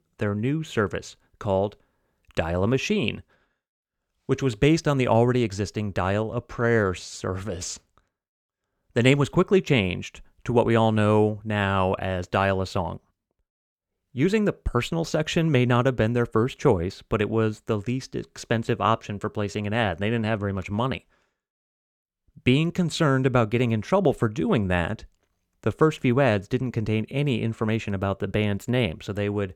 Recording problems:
none

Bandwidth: 18 kHz